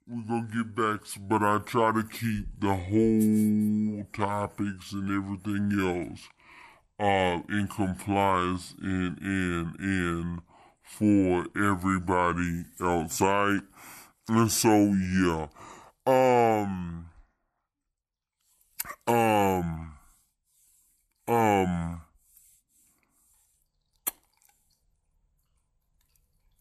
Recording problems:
wrong speed and pitch; too slow and too low; 0.6 times normal speed

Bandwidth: 13 kHz